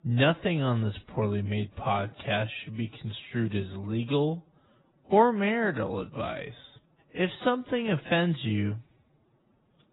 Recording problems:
garbled, watery; badly; nothing above 4 kHz
wrong speed, natural pitch; too slow; 0.6 times normal speed

